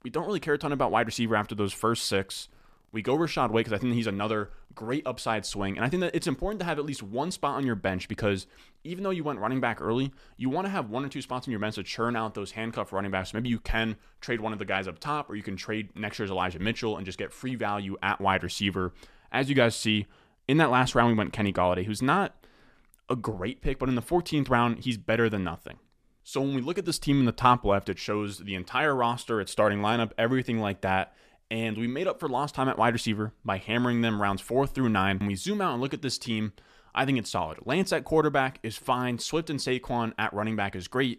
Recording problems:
none

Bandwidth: 14.5 kHz